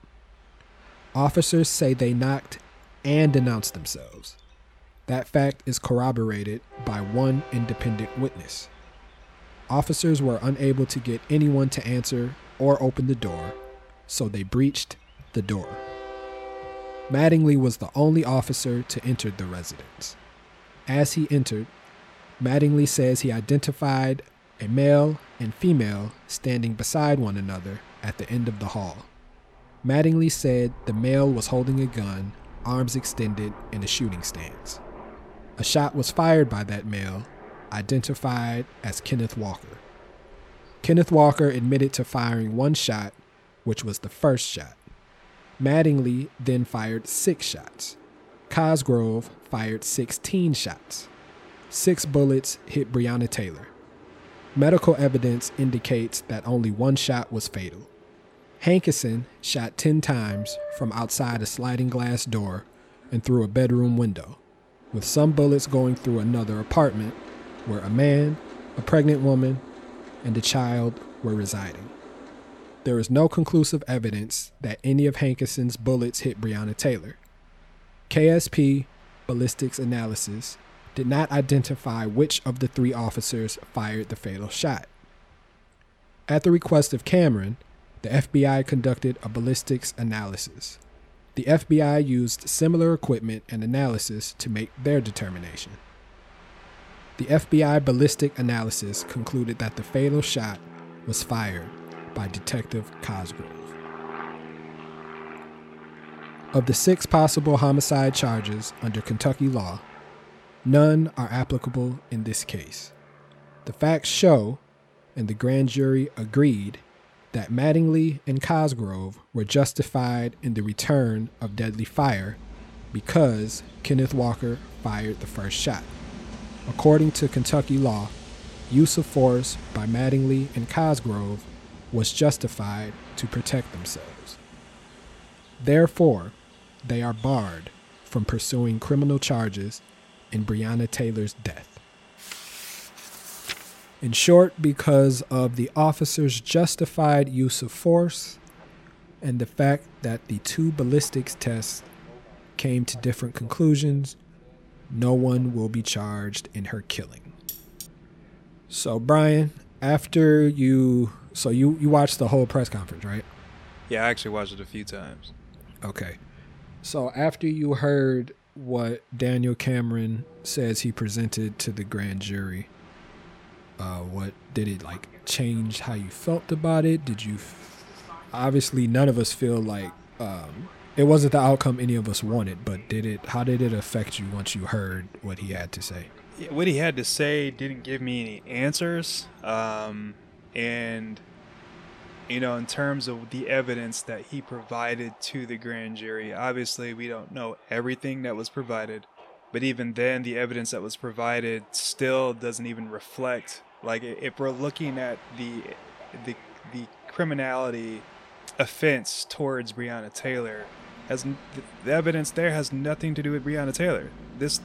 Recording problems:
train or aircraft noise; faint; throughout; 20 dB below the speech
clattering dishes; faint; at 2:37; peak 10 dB below the speech

